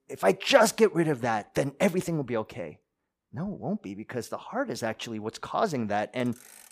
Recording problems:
traffic noise; faint; throughout; 25 dB below the speech

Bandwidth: 15 kHz